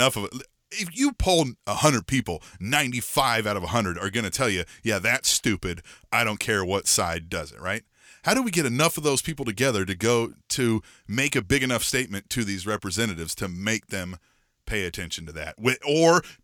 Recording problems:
abrupt cut into speech; at the start

